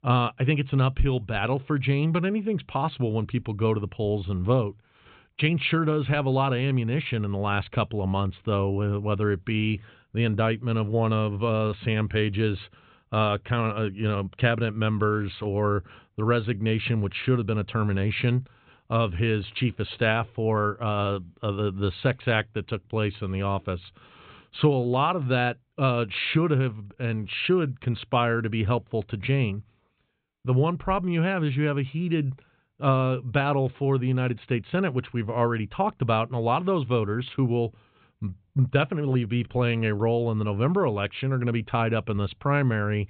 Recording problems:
high frequencies cut off; severe; nothing above 4 kHz

